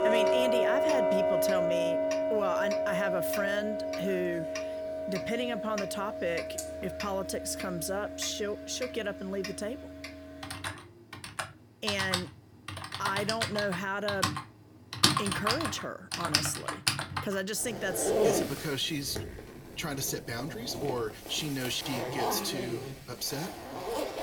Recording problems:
household noises; very loud; throughout; 2 dB above the speech

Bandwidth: 18 kHz